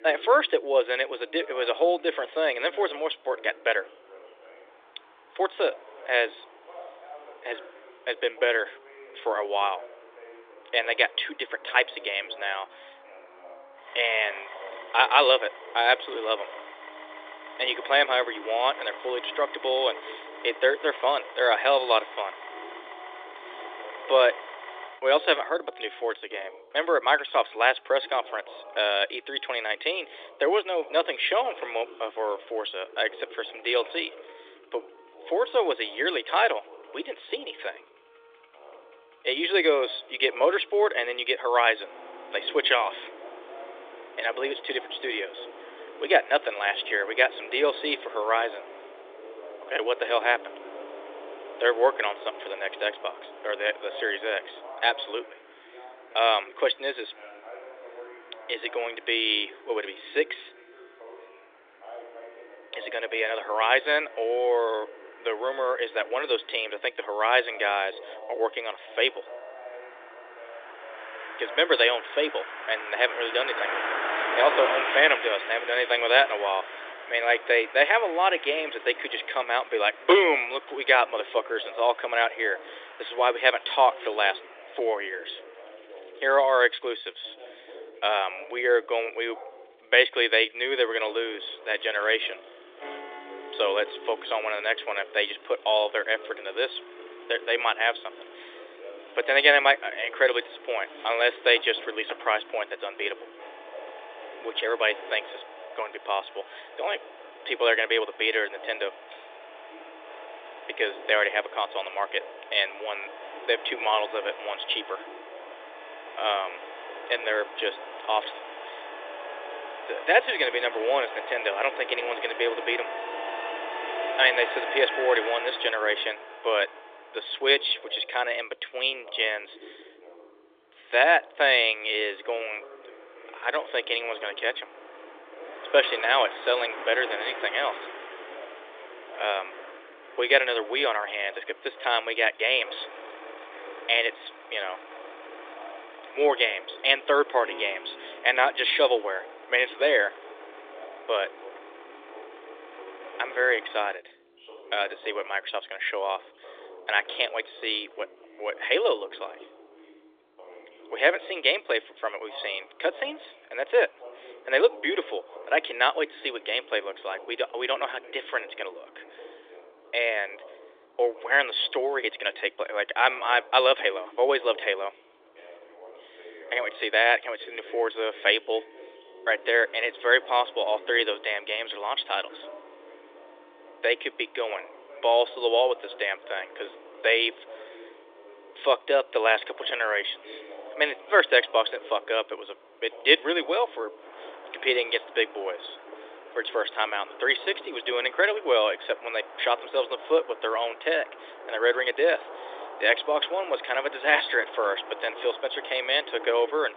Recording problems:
thin; very; fading below 300 Hz
phone-call audio
traffic noise; noticeable; throughout; 15 dB below the speech
background music; faint; throughout; 30 dB below the speech
voice in the background; faint; throughout; 20 dB below the speech

